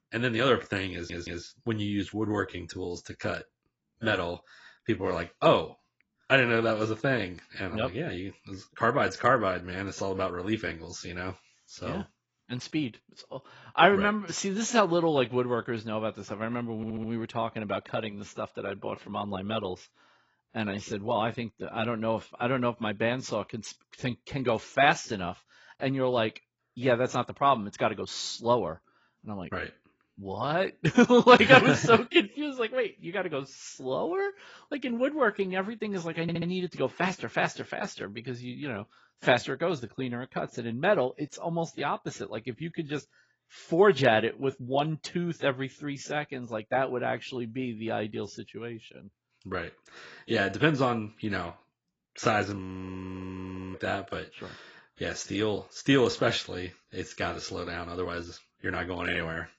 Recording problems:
garbled, watery; badly; nothing above 7.5 kHz
audio stuttering; at 1 s, at 17 s and at 36 s
audio freezing; at 53 s for 1 s

